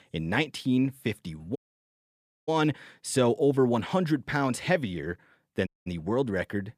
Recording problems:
audio cutting out; at 1.5 s for 1 s and at 5.5 s

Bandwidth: 14.5 kHz